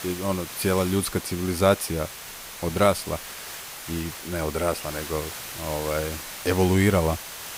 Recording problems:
hiss; loud; throughout; 9 dB below the speech
high-pitched whine; faint; throughout; 6 kHz, 25 dB below the speech

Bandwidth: 15.5 kHz